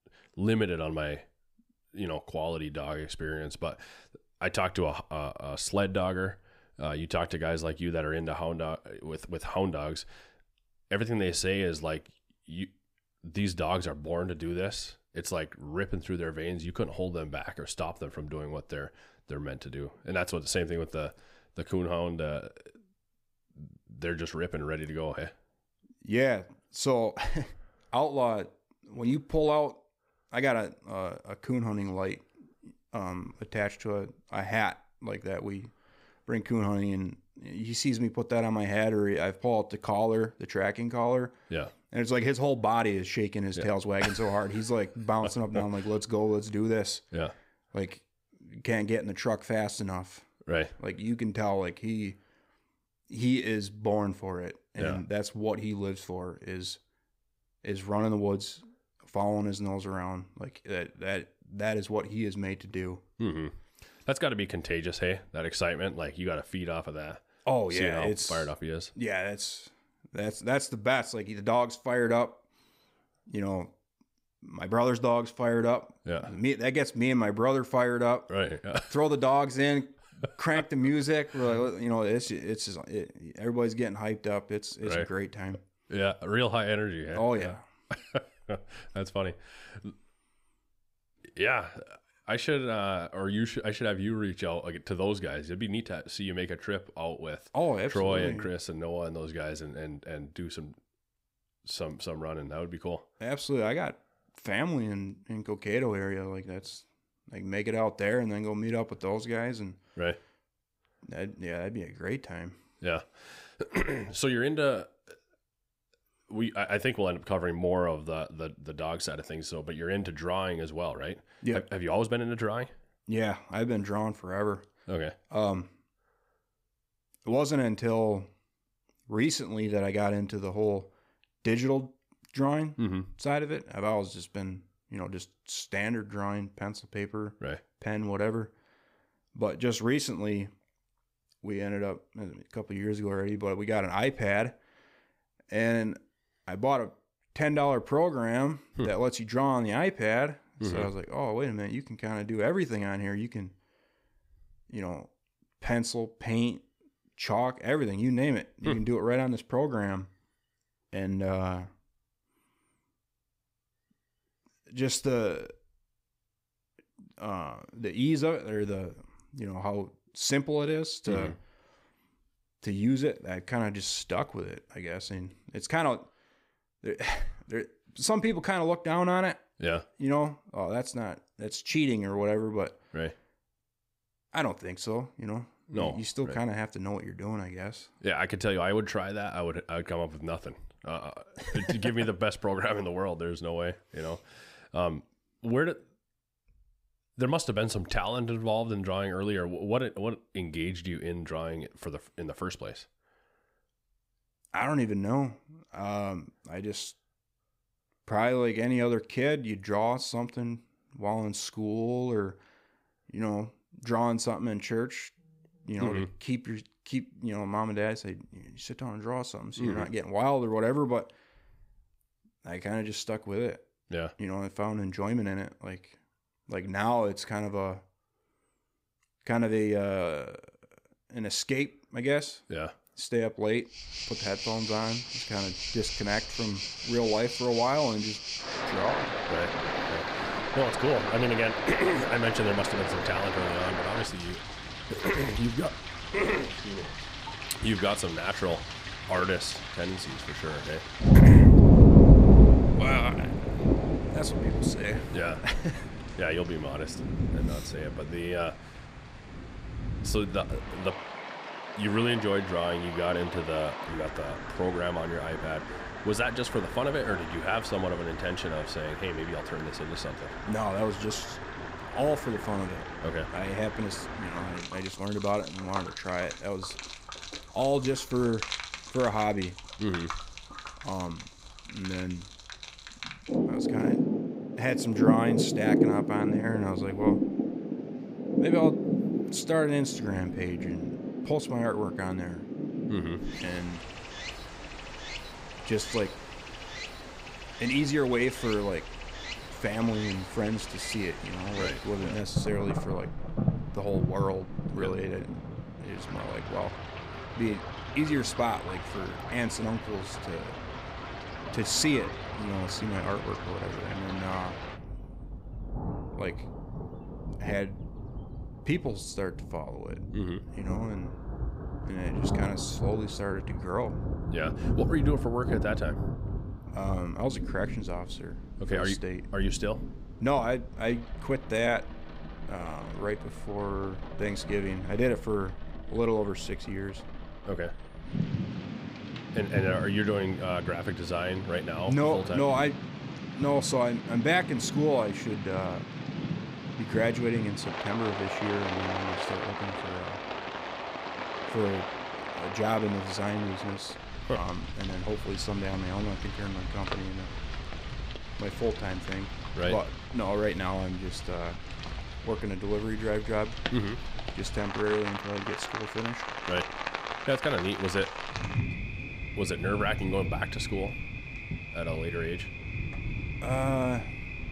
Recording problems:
rain or running water; very loud; from 3:54 on; 1 dB above the speech

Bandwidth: 15.5 kHz